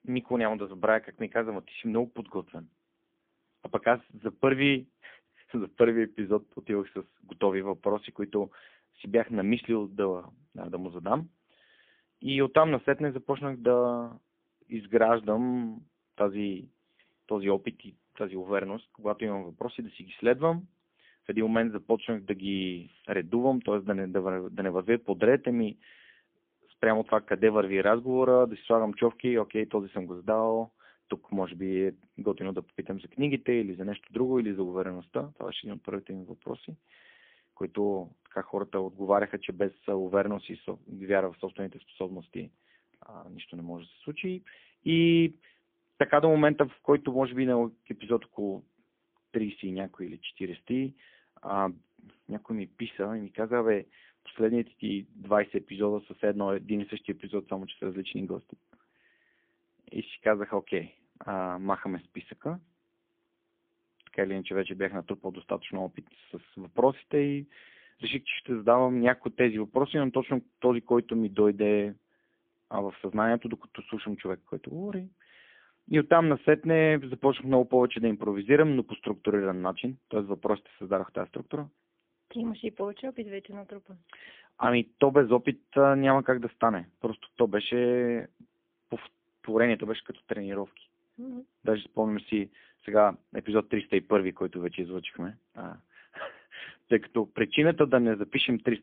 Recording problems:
phone-call audio; poor line; nothing above 3.5 kHz

